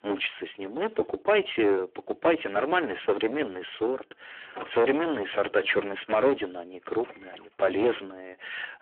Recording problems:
phone-call audio; poor line
distortion; heavy; 9 dB below the speech
household noises; noticeable; throughout; 15 dB below the speech

